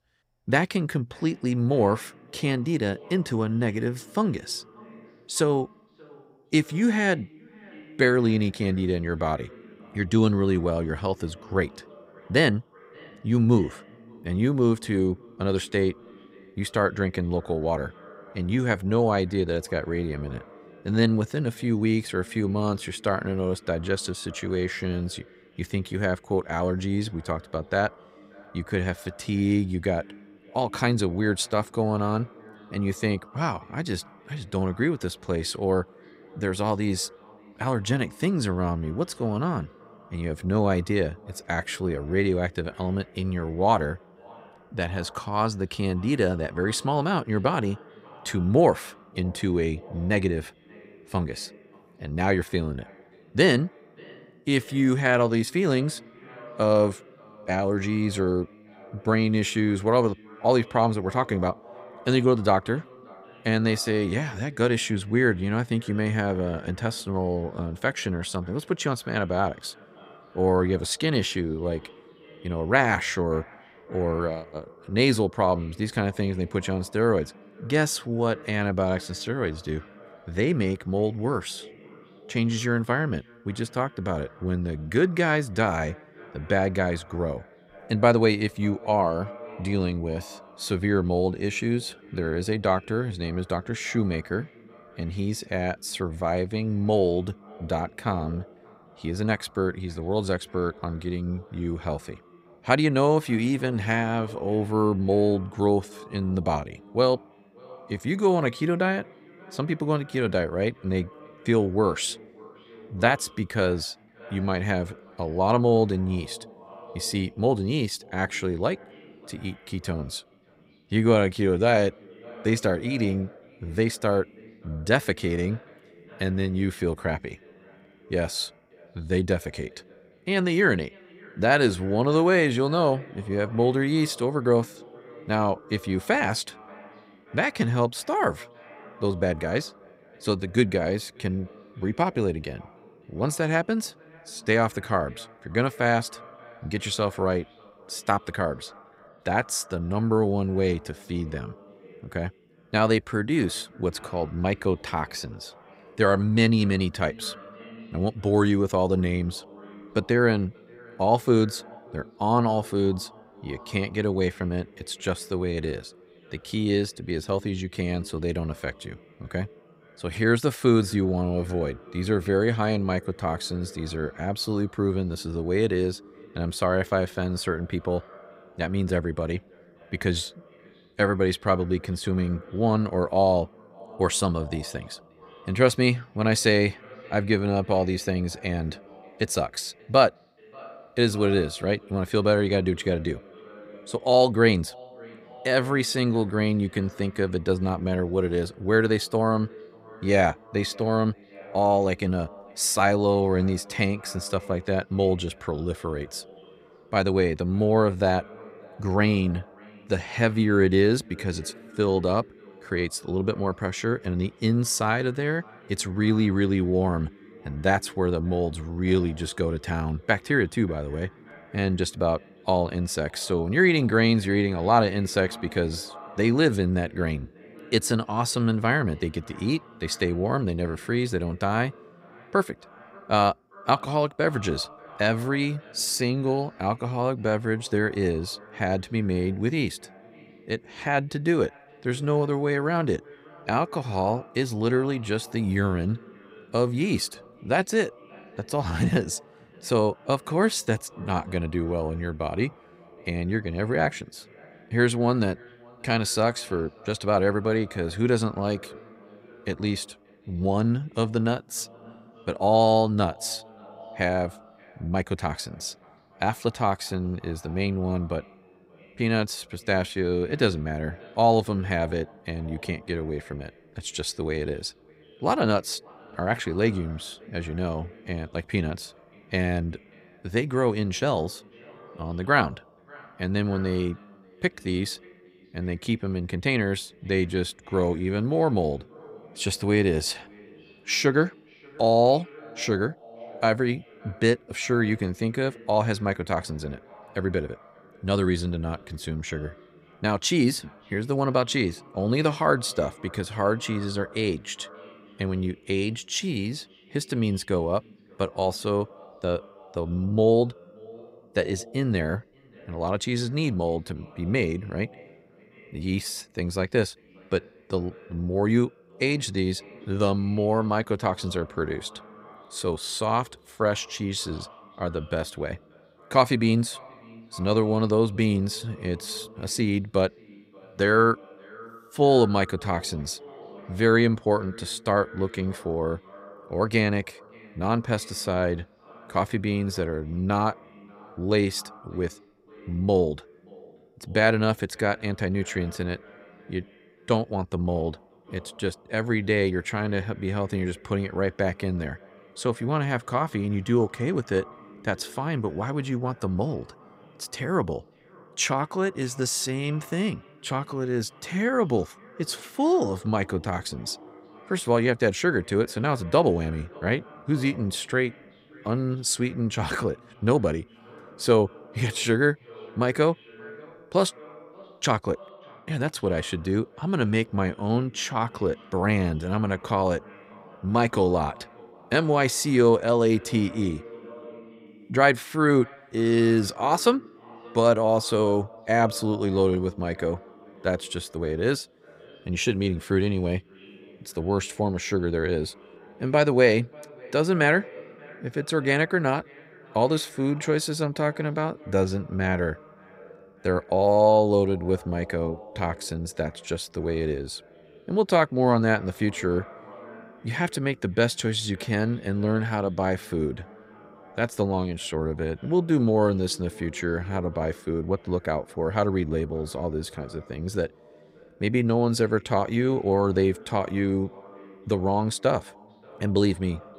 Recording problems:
echo of what is said; faint; throughout; 580 ms later, 25 dB below the speech

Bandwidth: 15.5 kHz